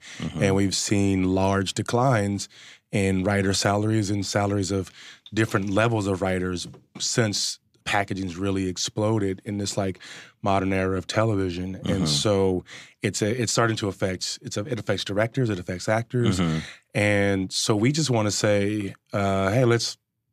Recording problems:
none

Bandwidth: 15 kHz